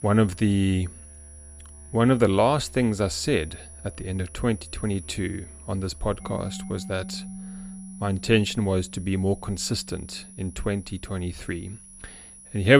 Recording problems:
high-pitched whine; noticeable; throughout; 10.5 kHz, 20 dB below the speech
background music; noticeable; throughout; 15 dB below the speech
abrupt cut into speech; at the end

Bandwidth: 15 kHz